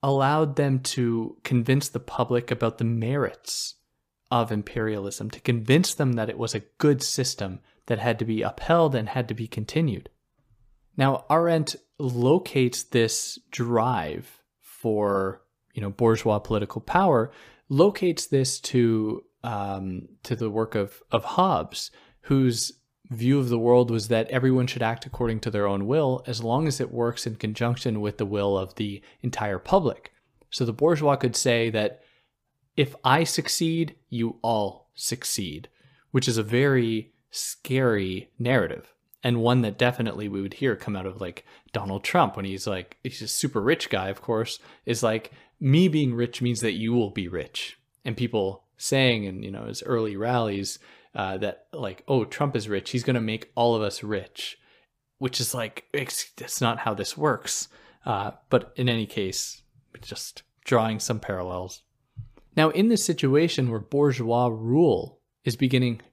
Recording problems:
none

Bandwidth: 15 kHz